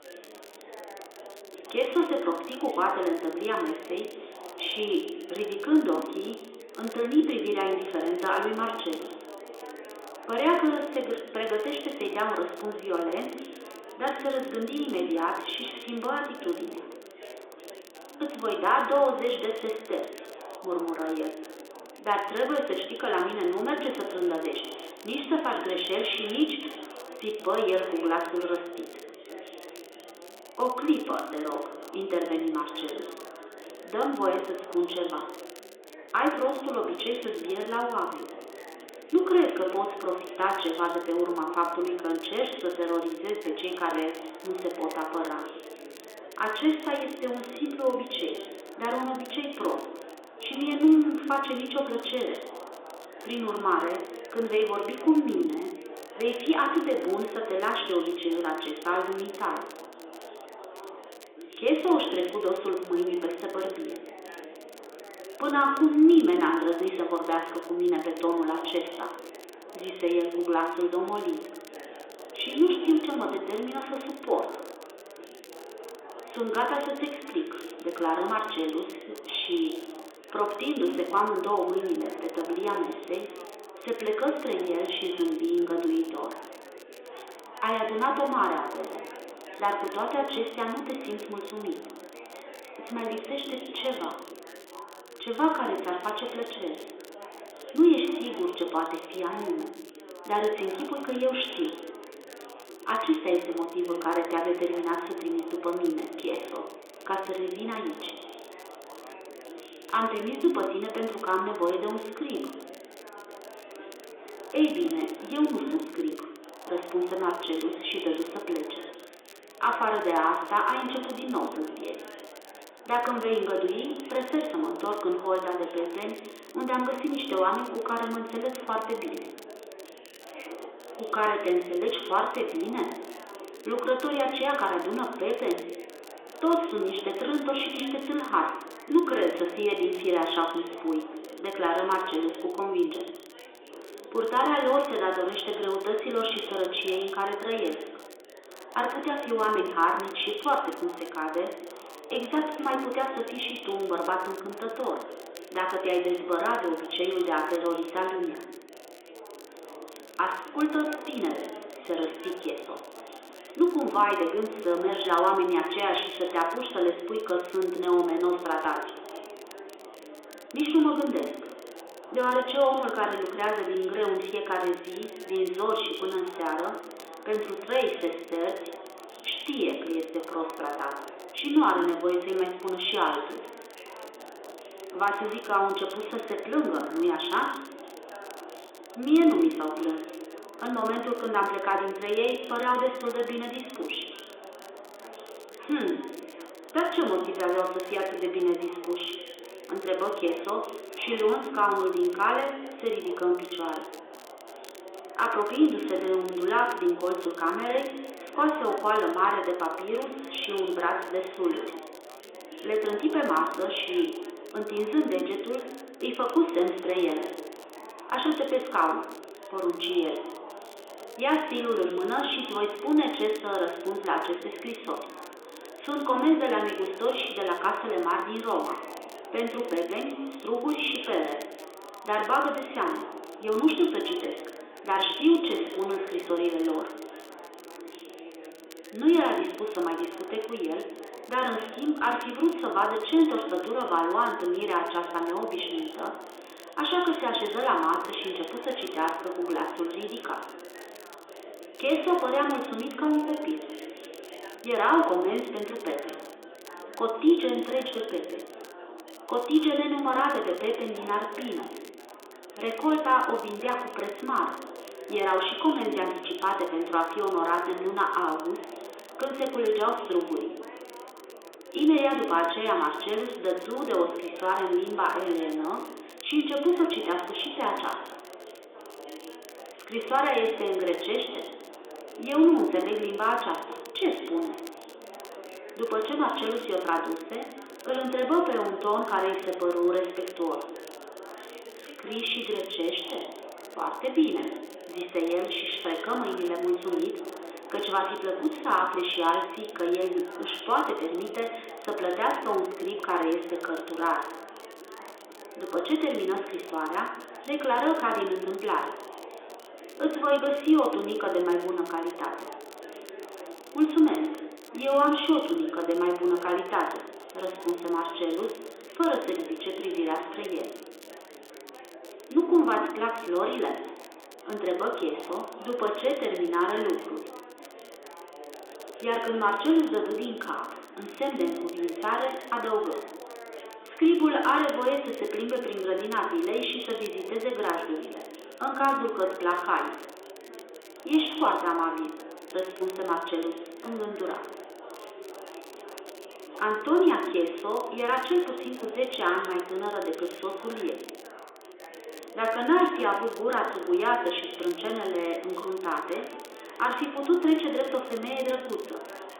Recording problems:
room echo; noticeable; dies away in 1 s
phone-call audio; nothing above 3.5 kHz
off-mic speech; somewhat distant
chatter from many people; noticeable; throughout; 15 dB below the speech
crackle, like an old record; faint; 25 dB below the speech

